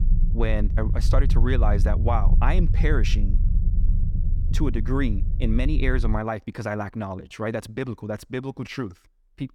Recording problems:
low rumble; noticeable; until 6 s; 10 dB below the speech

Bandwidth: 18 kHz